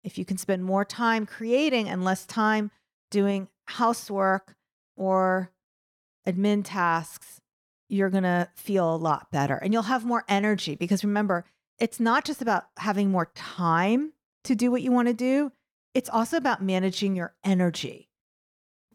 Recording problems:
none

